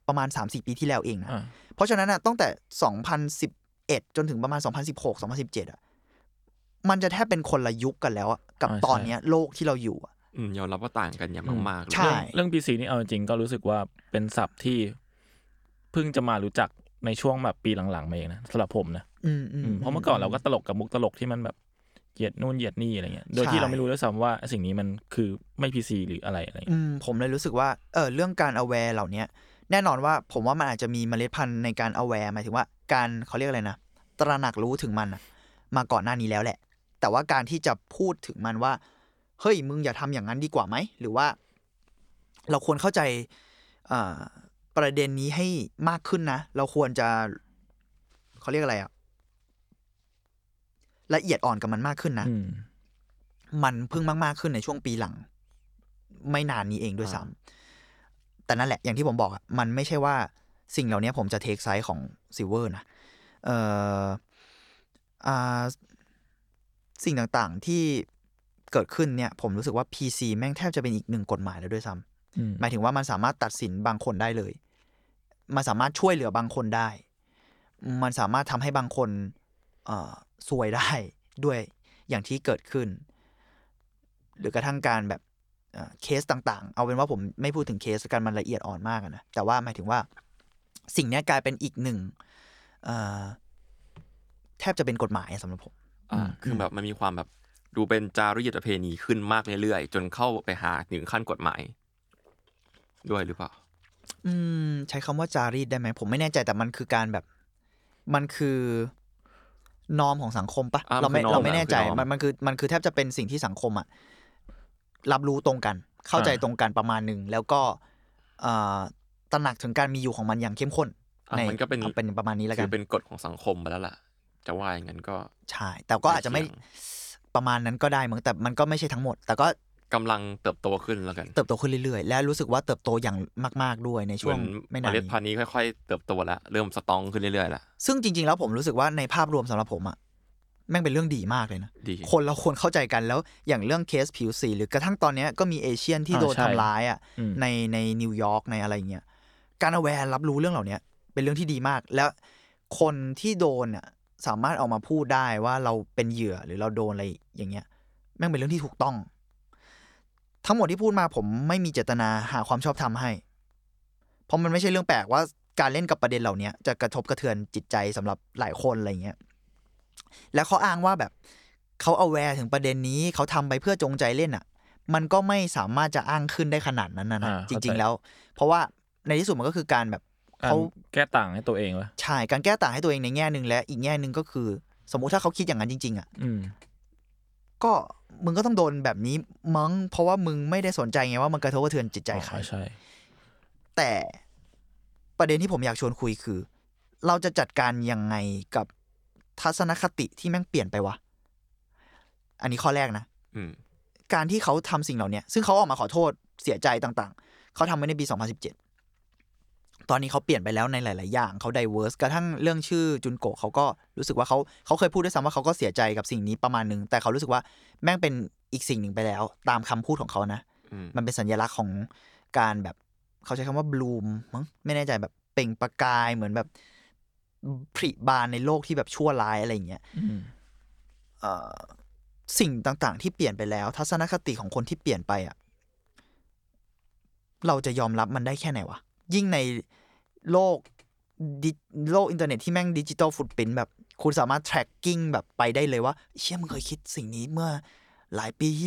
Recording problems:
abrupt cut into speech; at the end

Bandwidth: 18.5 kHz